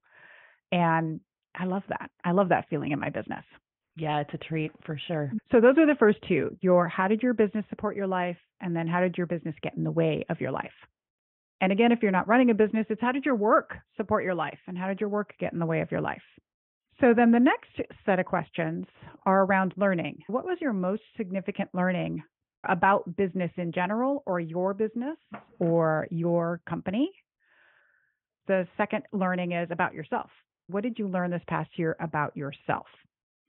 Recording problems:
high frequencies cut off; severe; nothing above 3.5 kHz

